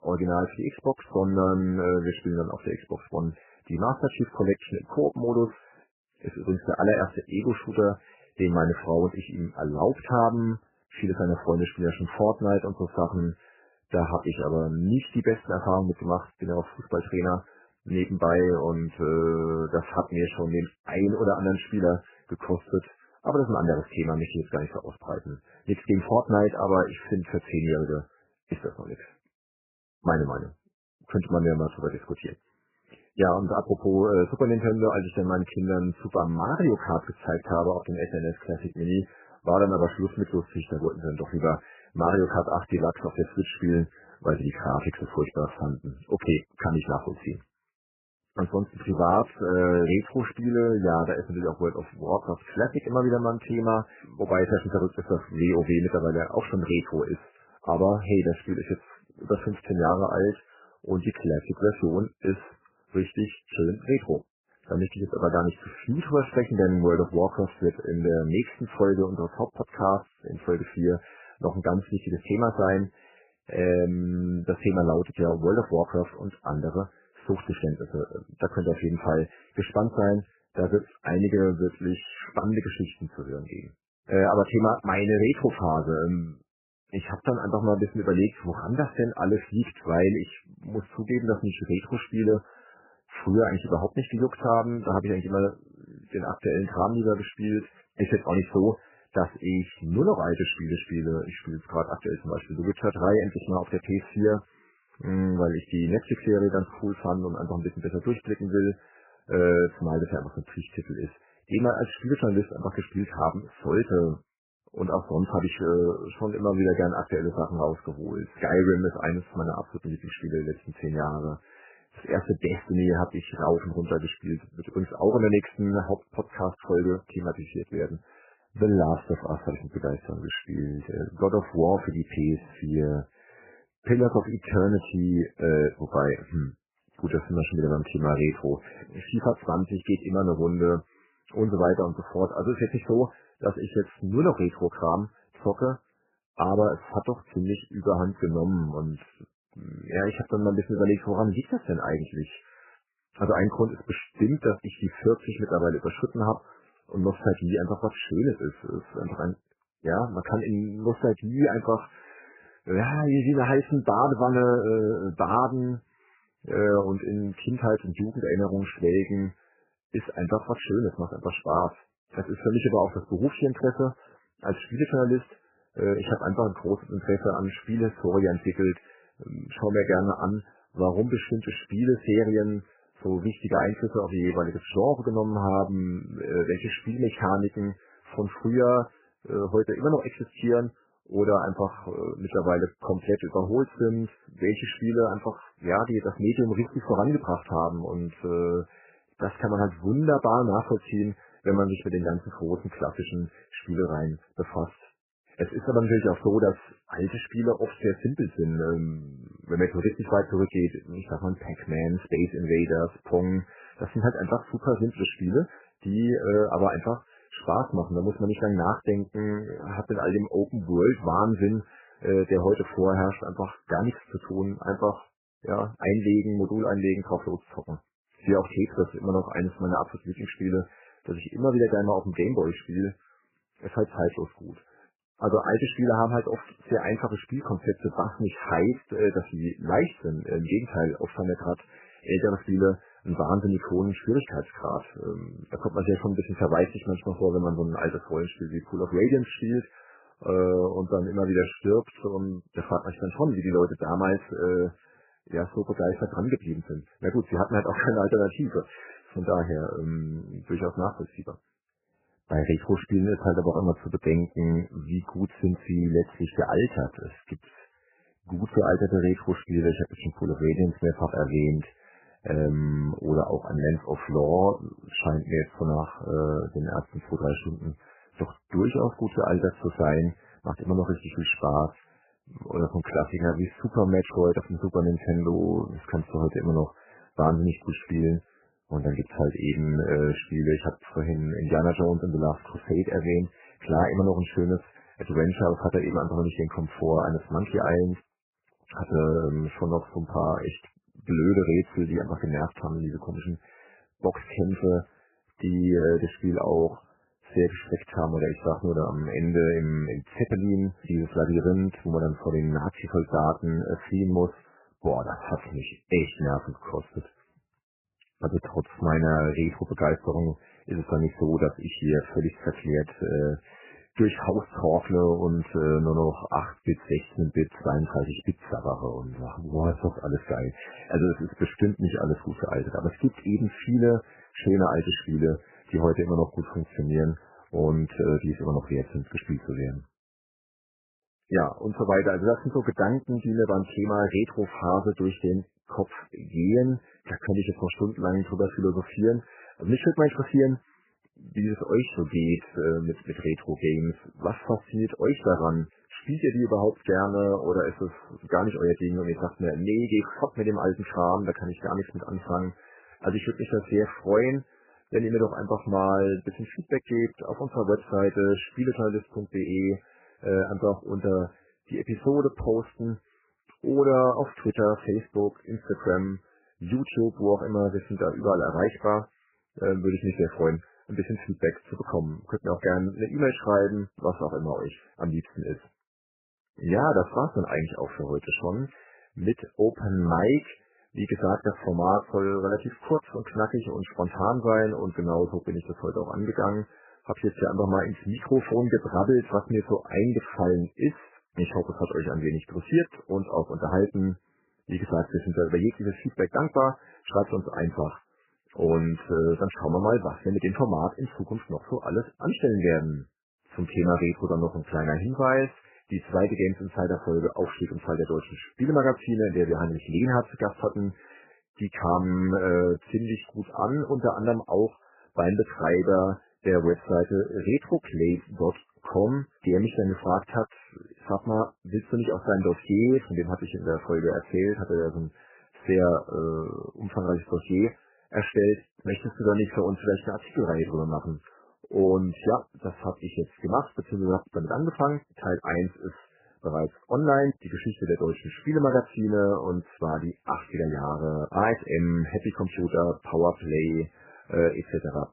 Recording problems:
garbled, watery; badly; nothing above 3 kHz

